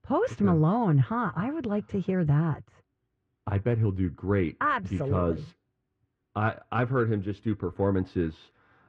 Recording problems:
muffled; very; fading above 1.5 kHz

